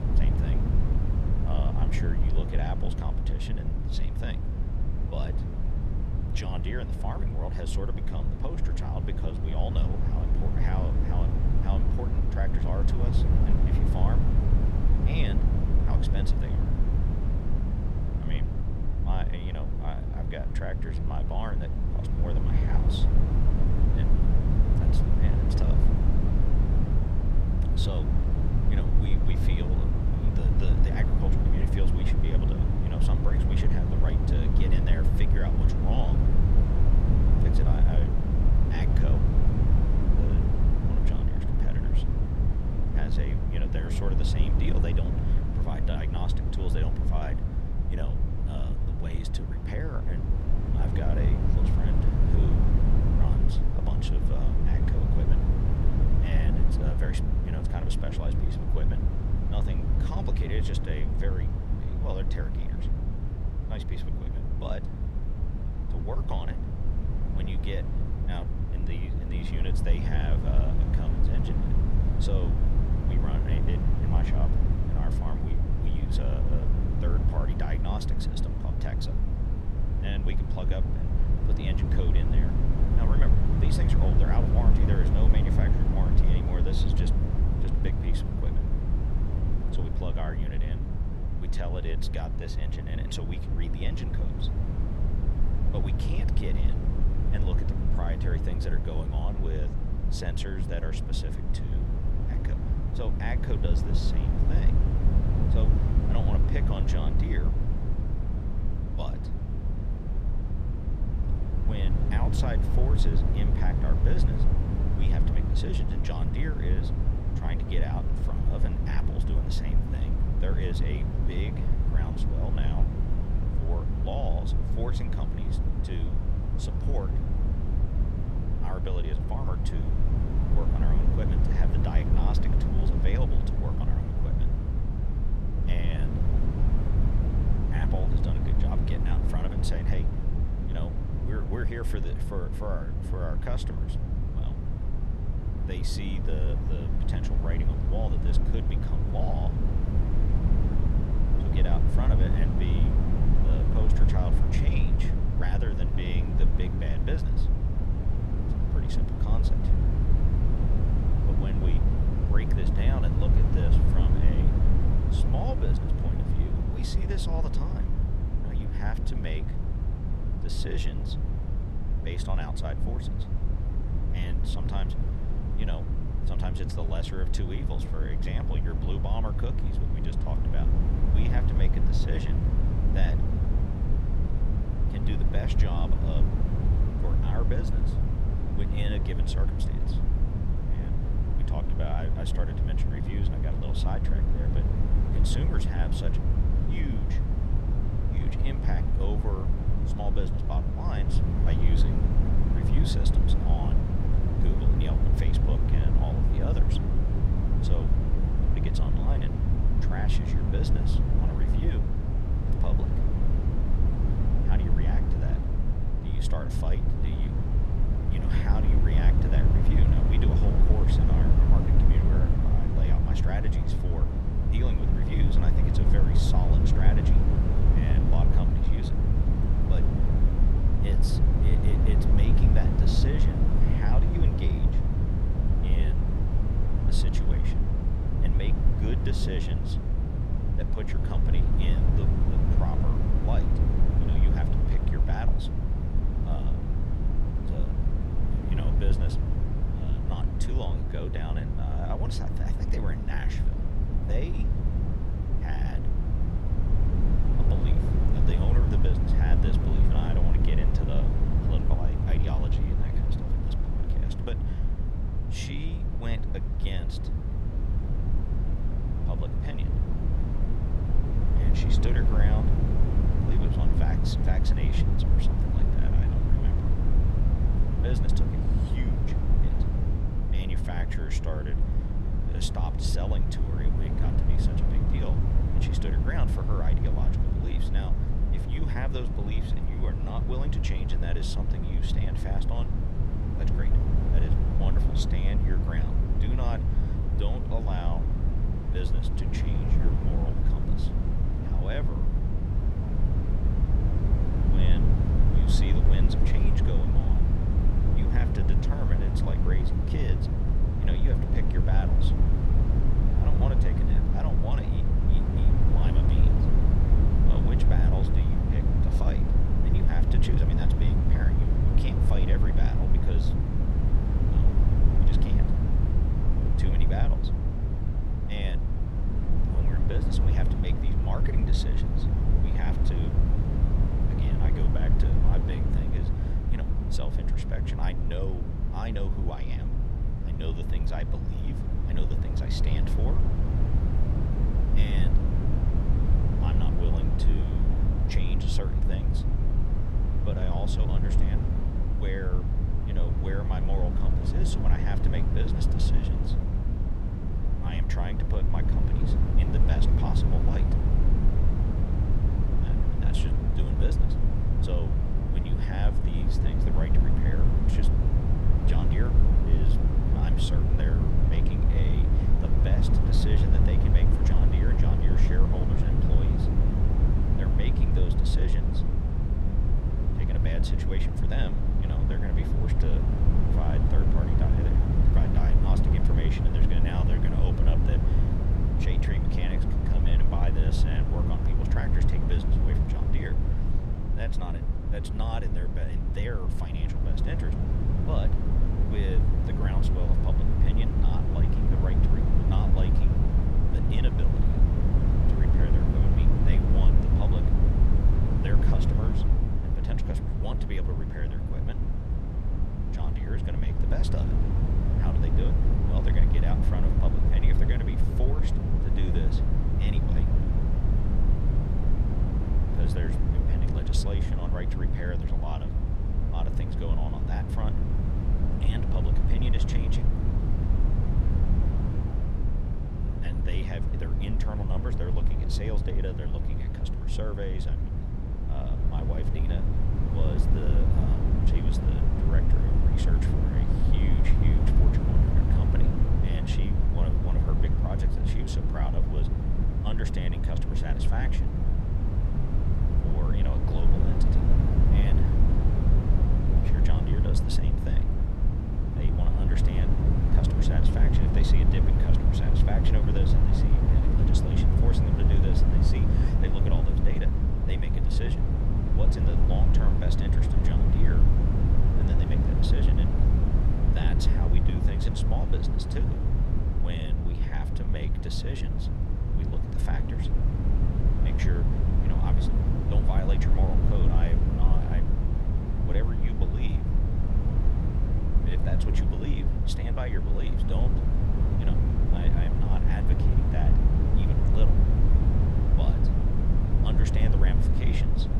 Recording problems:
wind noise on the microphone; heavy; 1 dB above the speech

